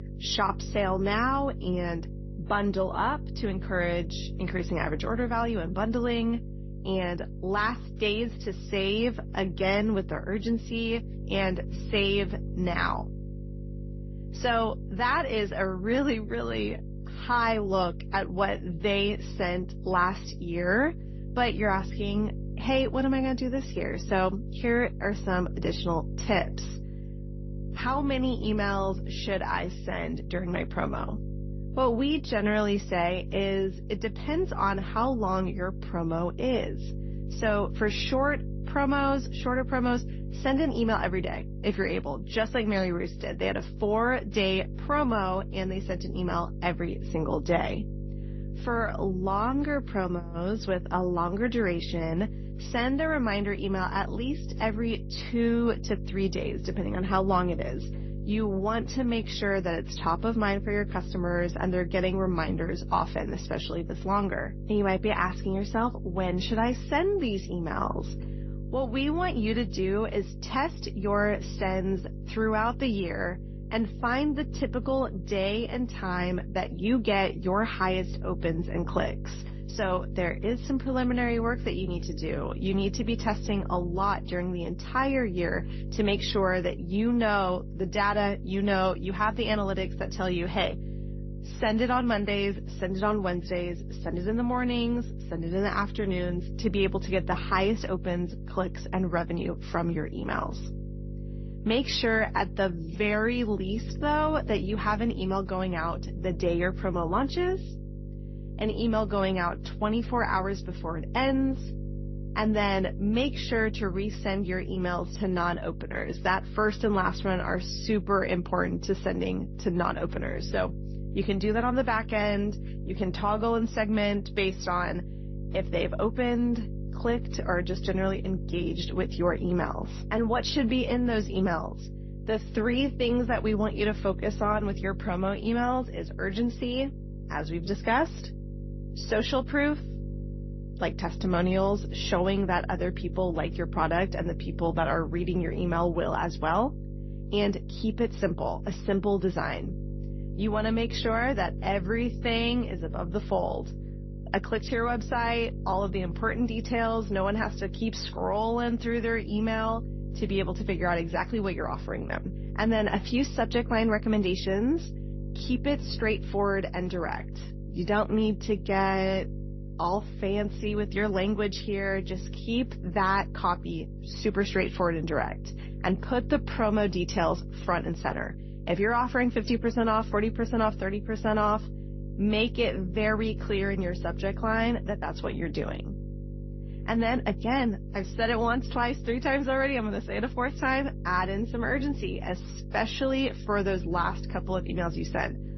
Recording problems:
garbled, watery; slightly; nothing above 6 kHz
electrical hum; noticeable; throughout; 50 Hz, 20 dB below the speech

